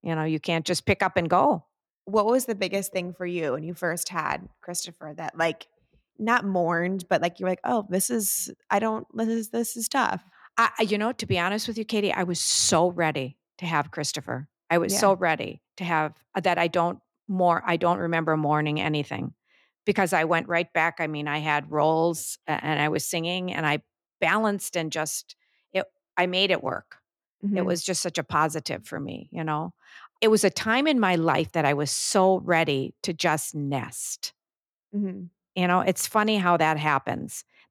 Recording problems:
none

